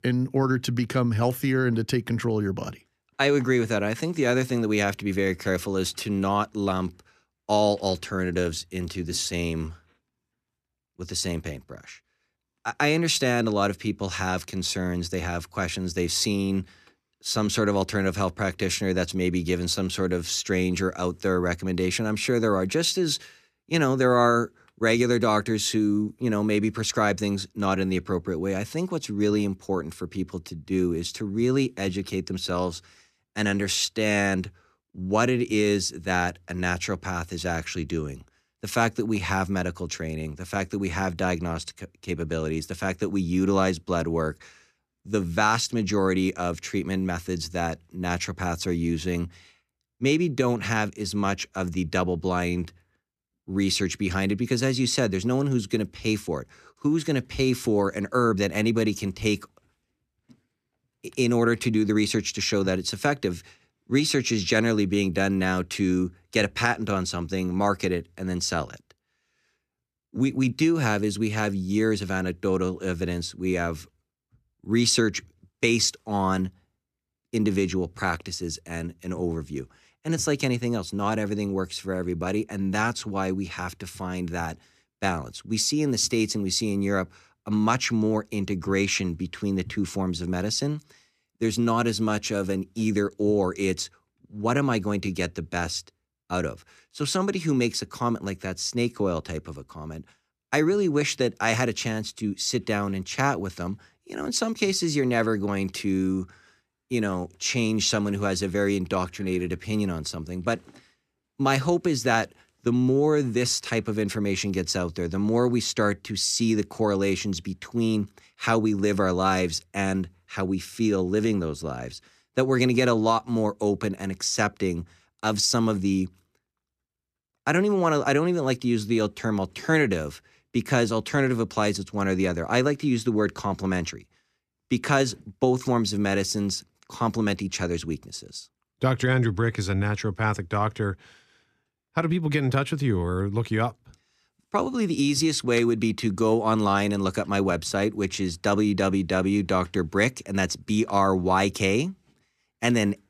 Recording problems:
none

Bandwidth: 14.5 kHz